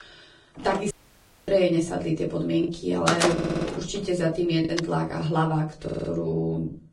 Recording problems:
garbled, watery; badly
room echo; very slight; dies away in 0.3 s
off-mic speech; somewhat distant
choppy; occasionally; 2% of the speech affected
door banging; loud; from 0.5 to 5 s; peak 3 dB above the speech
audio cutting out; at 1 s for 0.5 s
audio stuttering; at 3.5 s and at 6 s

